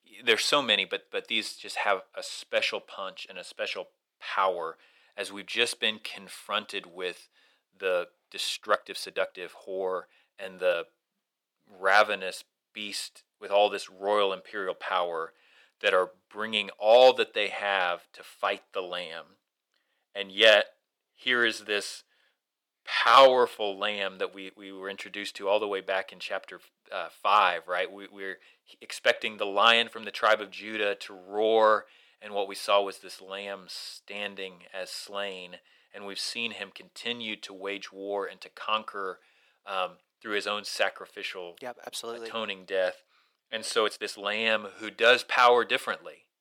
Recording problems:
thin; very; fading below 550 Hz
uneven, jittery; strongly; from 6 to 44 s

